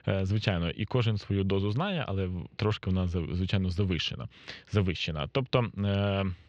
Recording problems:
muffled; slightly; fading above 4 kHz

